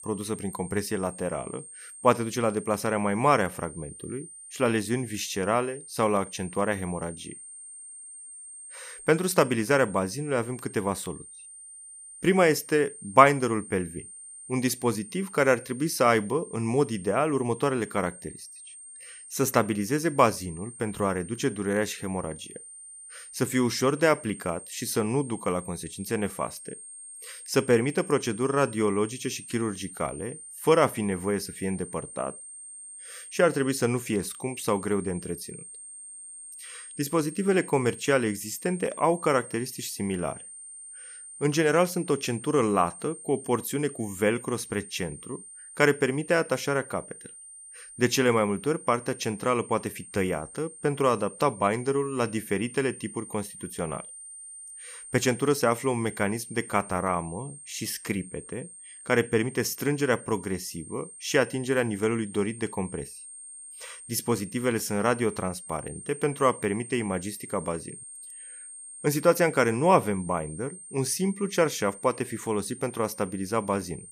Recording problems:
high-pitched whine; noticeable; throughout; 8.5 kHz, 15 dB below the speech

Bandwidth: 15 kHz